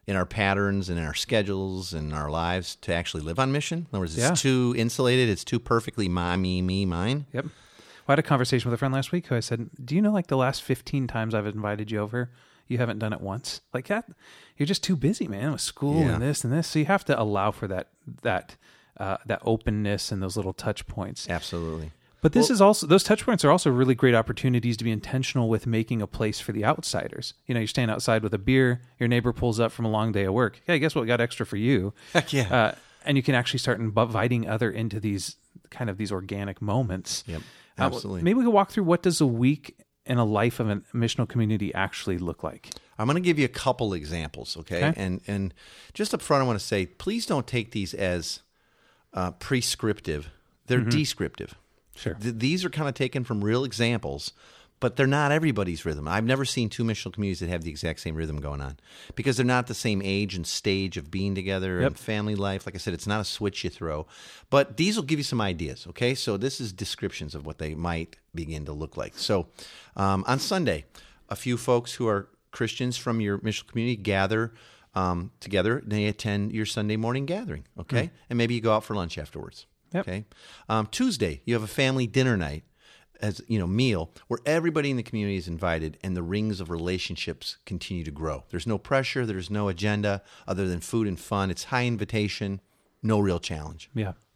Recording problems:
none

